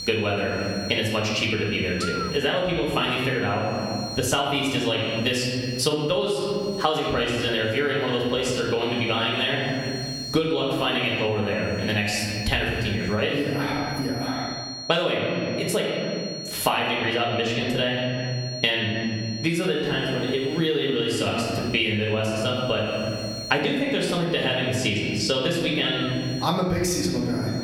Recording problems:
off-mic speech; far
room echo; noticeable; dies away in 1.3 s
squashed, flat; somewhat
electrical hum; noticeable; until 14 s and from 20 s on; 60 Hz, 15 dB below the speech
high-pitched whine; noticeable; throughout; 4.5 kHz, 15 dB below the speech

